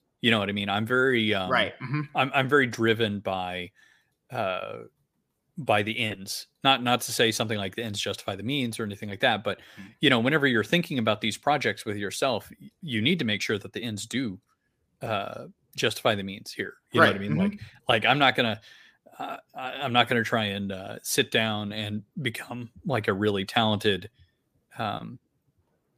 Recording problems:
none

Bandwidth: 15 kHz